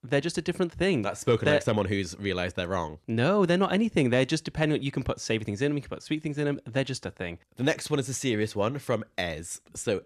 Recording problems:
none

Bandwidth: 13.5 kHz